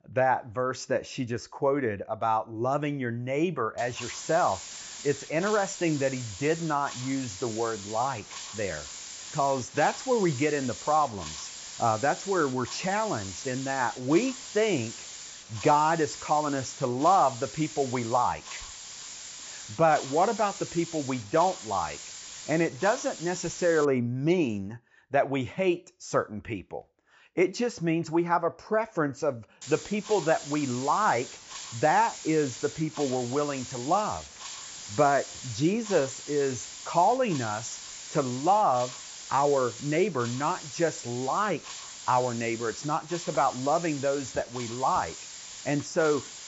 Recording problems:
high frequencies cut off; noticeable; nothing above 8 kHz
hiss; noticeable; from 4 to 24 s and from 30 s on; 10 dB below the speech

